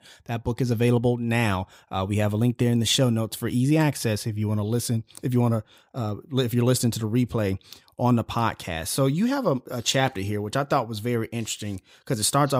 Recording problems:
abrupt cut into speech; at the end

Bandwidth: 15.5 kHz